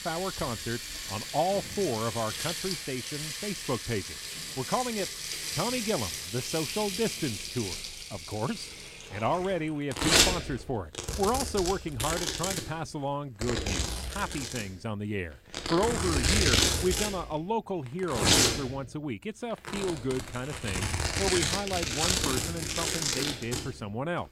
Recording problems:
household noises; very loud; throughout; 3 dB above the speech

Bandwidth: 16 kHz